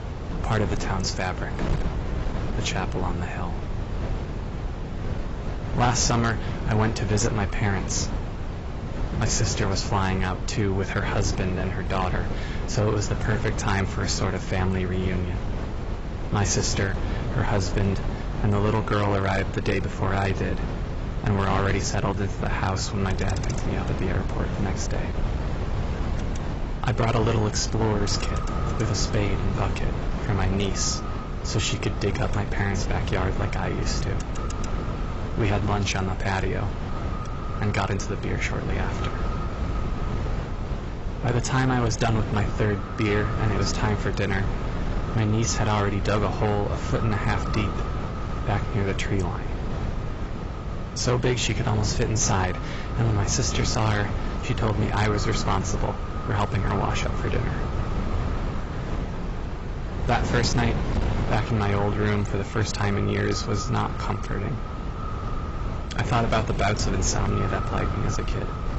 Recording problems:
garbled, watery; badly; nothing above 7.5 kHz
echo of what is said; noticeable; from 27 s on; 570 ms later, 15 dB below the speech
distortion; slight; 10 dB below the speech
wind noise on the microphone; heavy; 8 dB below the speech
traffic noise; noticeable; throughout; 20 dB below the speech

